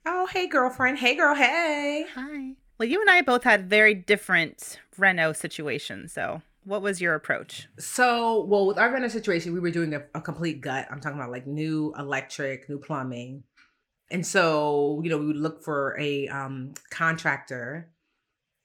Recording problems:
none

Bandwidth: 18.5 kHz